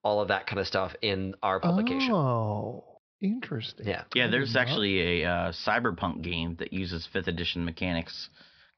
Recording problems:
high frequencies cut off; noticeable; nothing above 5.5 kHz

